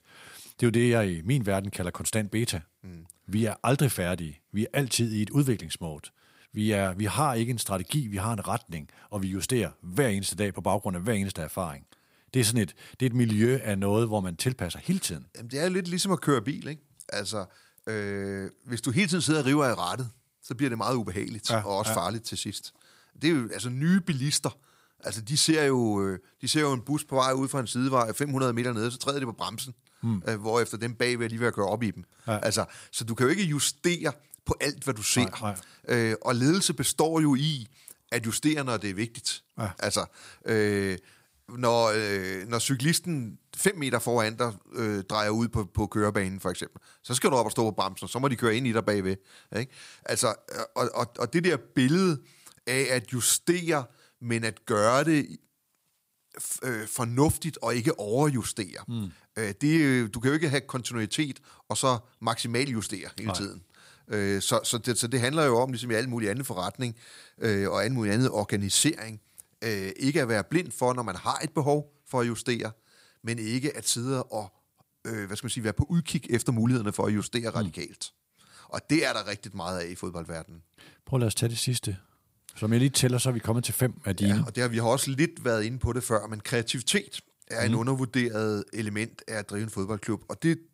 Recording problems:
none

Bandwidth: 15.5 kHz